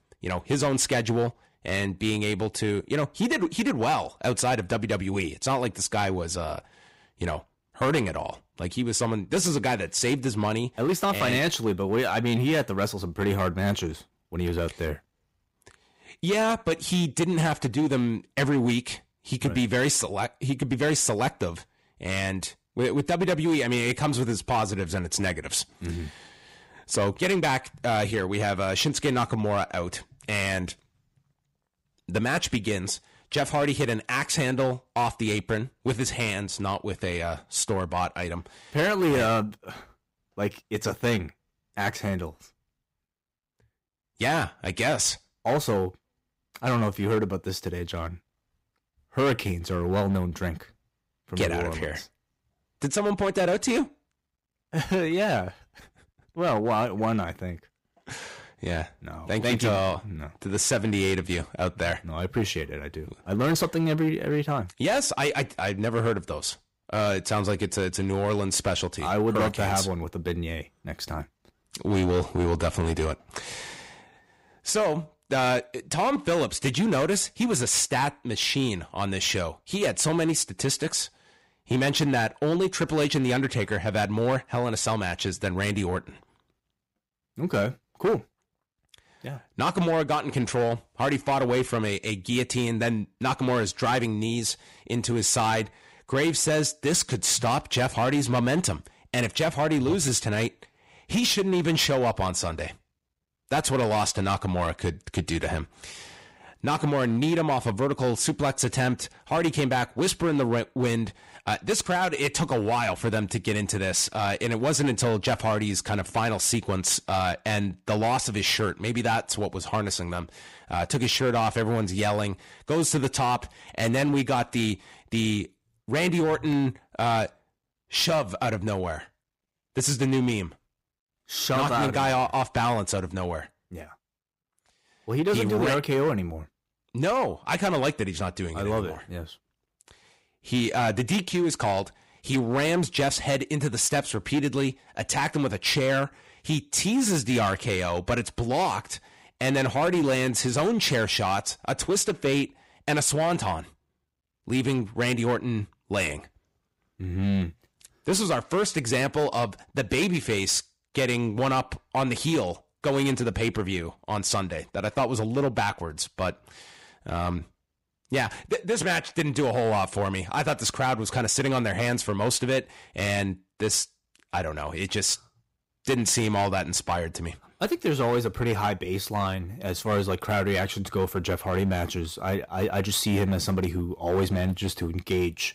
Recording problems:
distortion; slight; 7% of the sound clipped

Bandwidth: 15.5 kHz